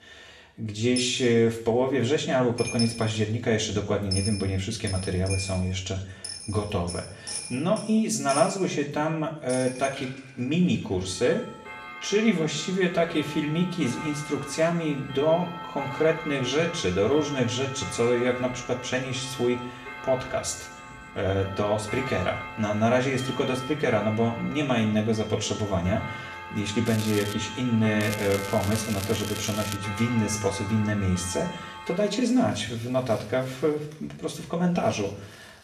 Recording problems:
off-mic speech; far
room echo; slight; dies away in 0.7 s
household noises; noticeable; throughout; 10 dB below the speech
crackling; noticeable; at 27 s and from 28 to 30 s; 10 dB below the speech

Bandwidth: 13.5 kHz